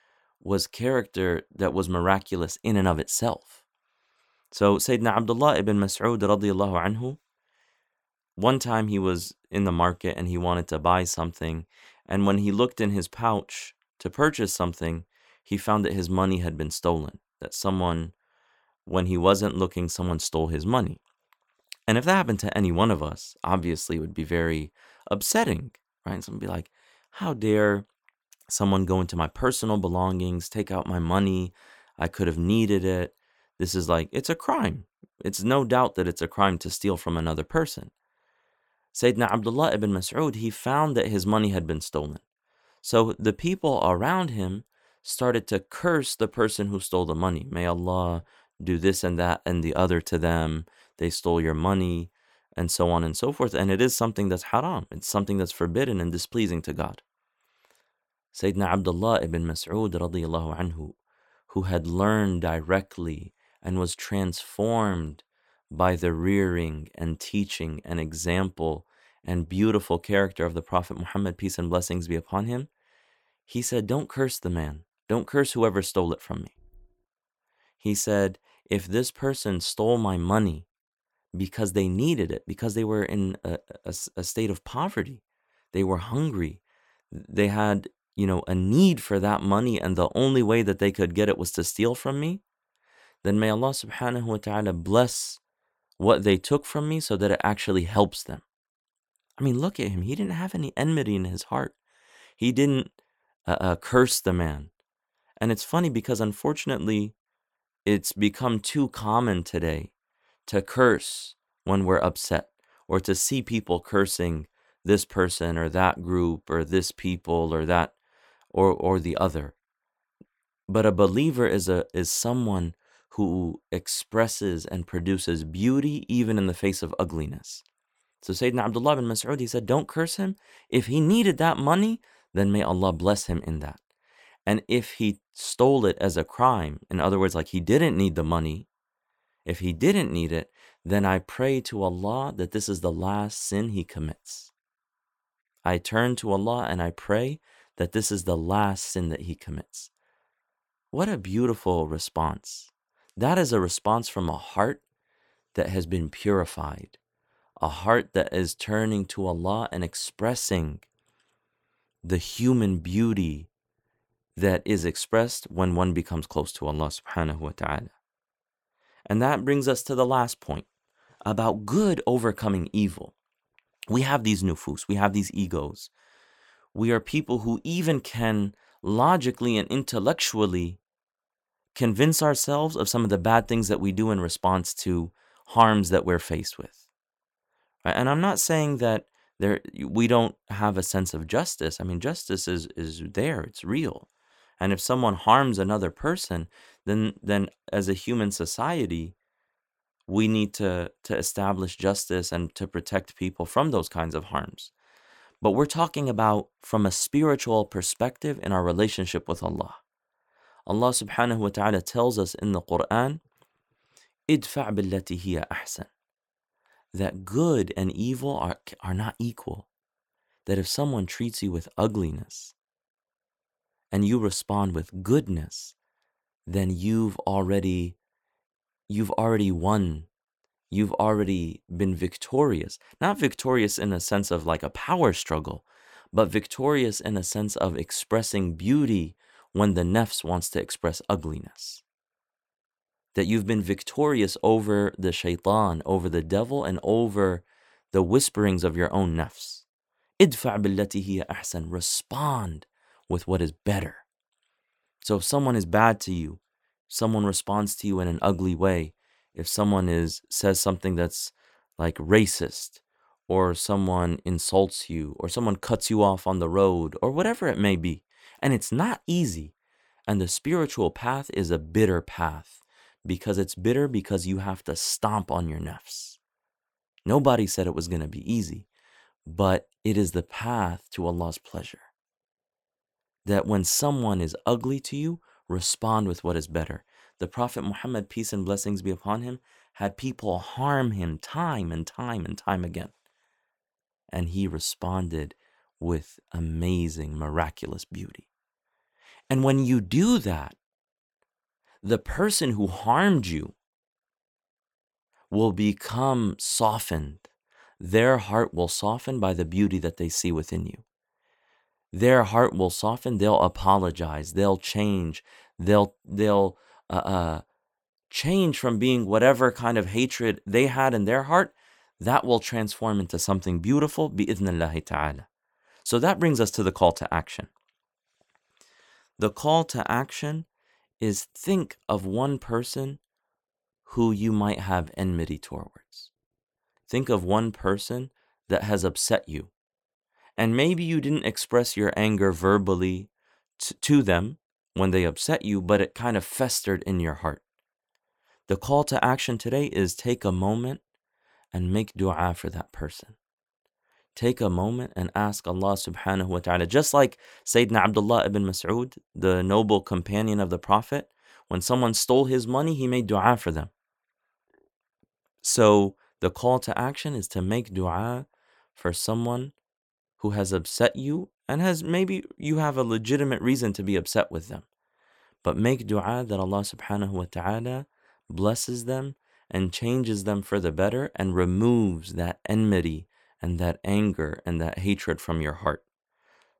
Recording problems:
none

